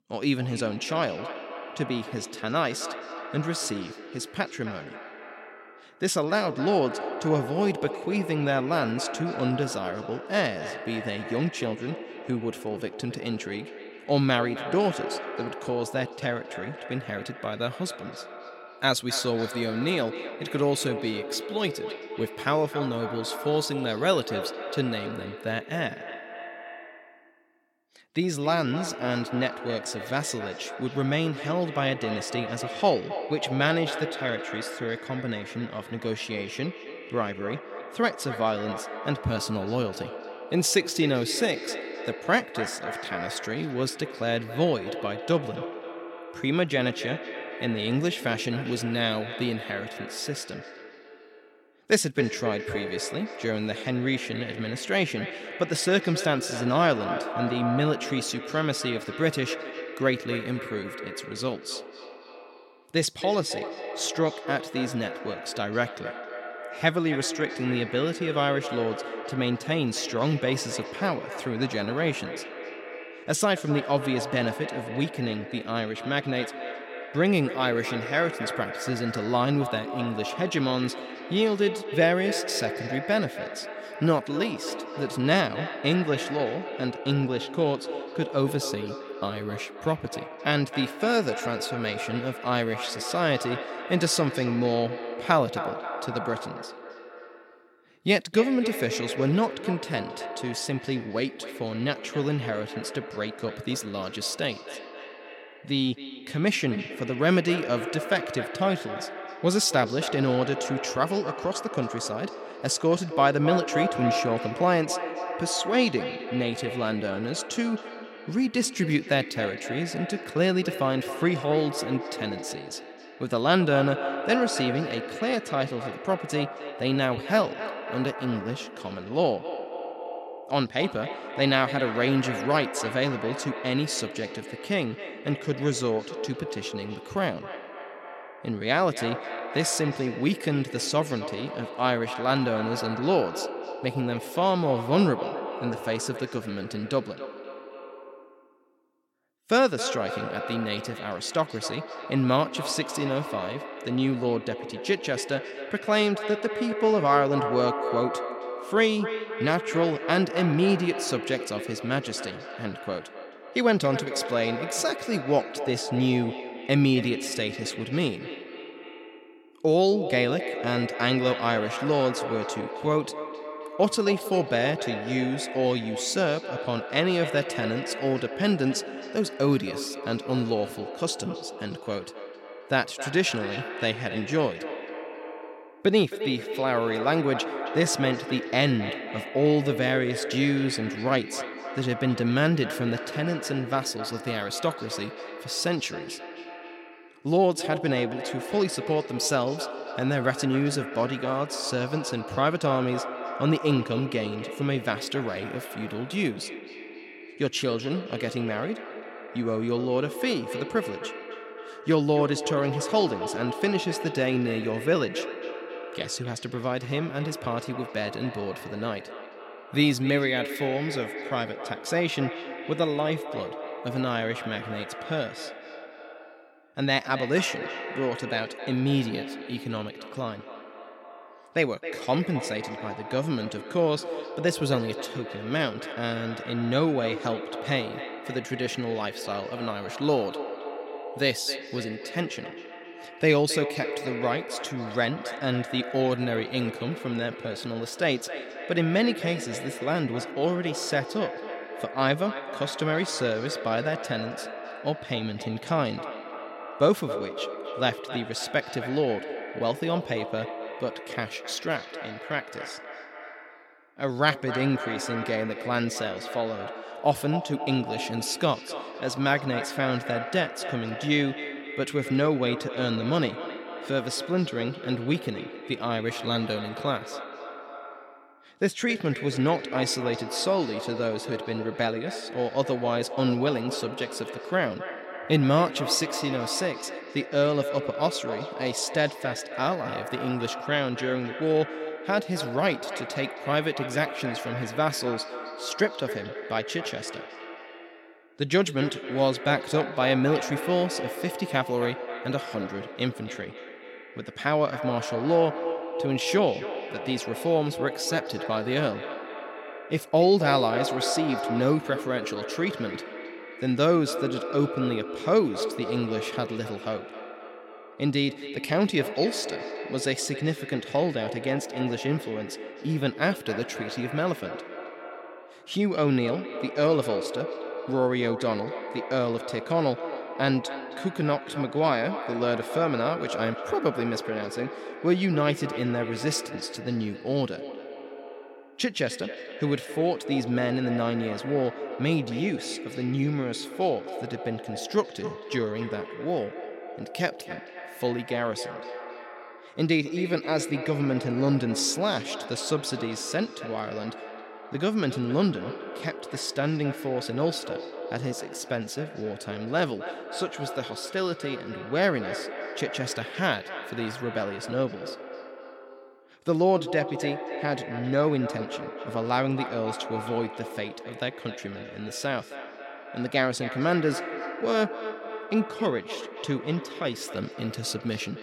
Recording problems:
echo of what is said; strong; throughout; 270 ms later, 8 dB below the speech

